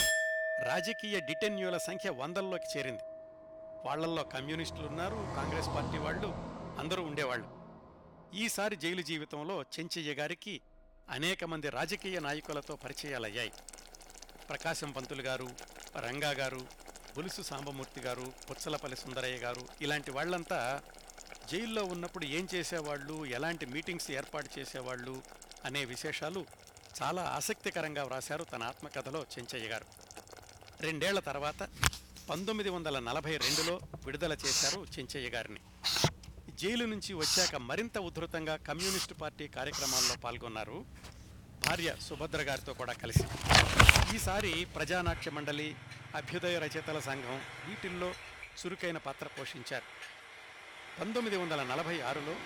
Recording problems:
household noises; very loud; throughout; 4 dB above the speech
traffic noise; noticeable; throughout; 10 dB below the speech

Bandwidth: 18.5 kHz